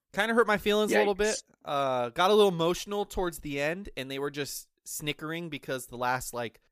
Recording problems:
none

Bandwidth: 15 kHz